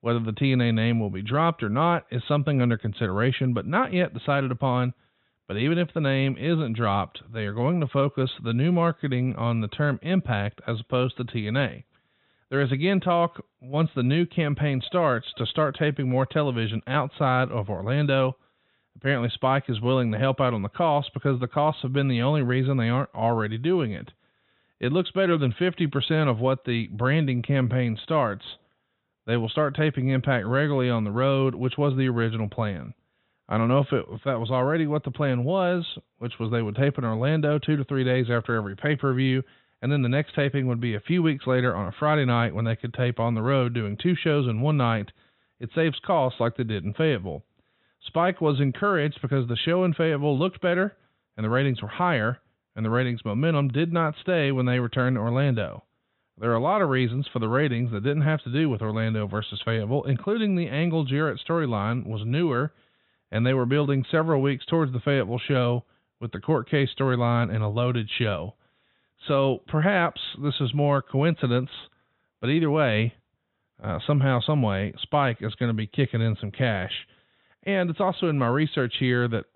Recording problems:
high frequencies cut off; severe; nothing above 4 kHz

